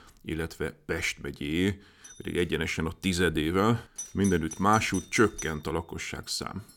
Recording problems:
alarms or sirens; noticeable; from 2.5 s on; 15 dB below the speech

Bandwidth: 17 kHz